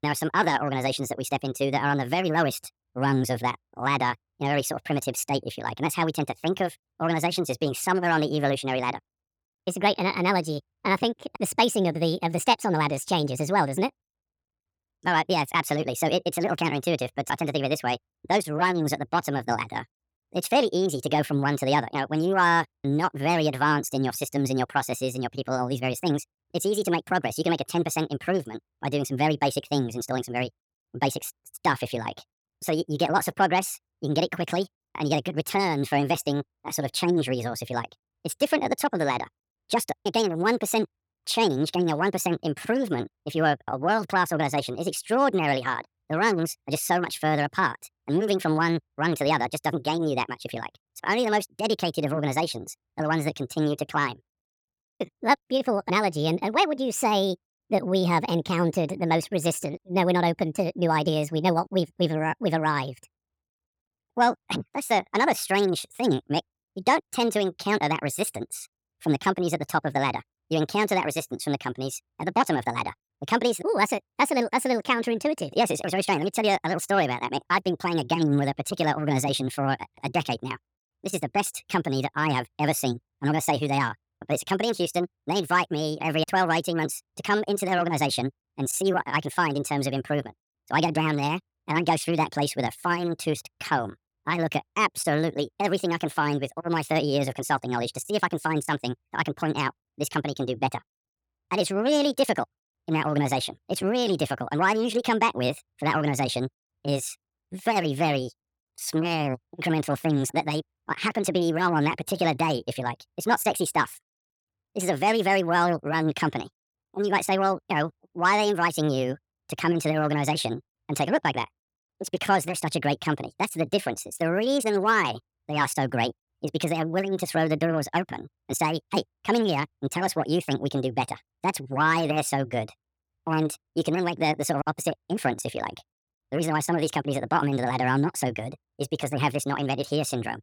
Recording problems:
wrong speed and pitch; too fast and too high; 1.6 times normal speed

